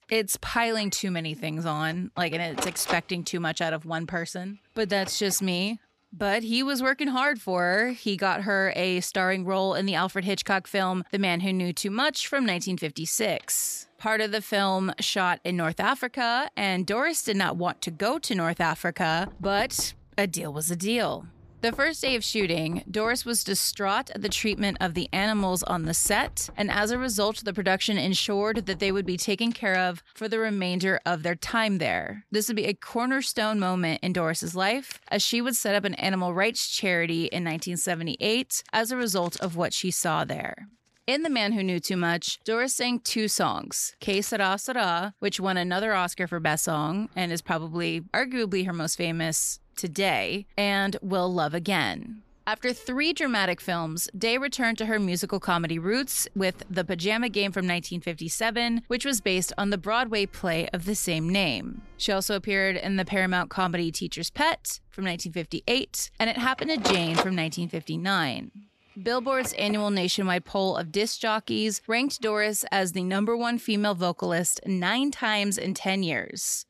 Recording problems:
household noises; noticeable; throughout; 15 dB below the speech

